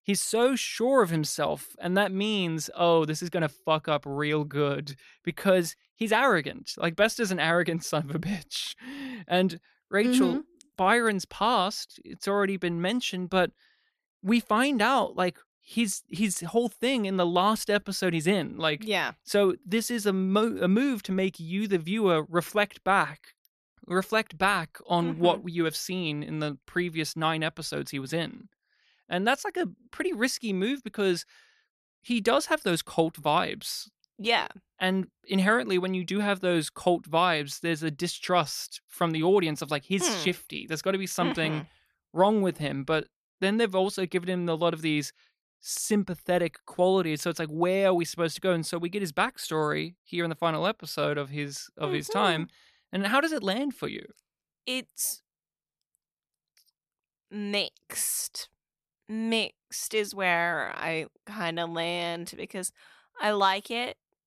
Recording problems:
none

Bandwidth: 14 kHz